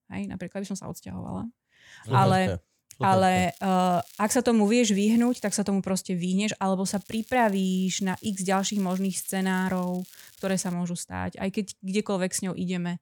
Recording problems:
crackling; faint; from 3.5 to 4.5 s, at 5 s and from 7 to 11 s; 25 dB below the speech

